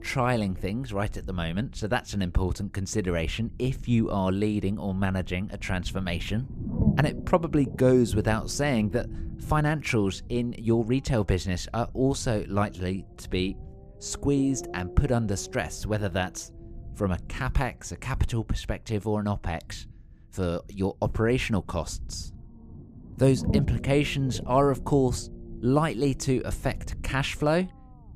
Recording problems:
low rumble; noticeable; throughout; 15 dB below the speech

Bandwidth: 14.5 kHz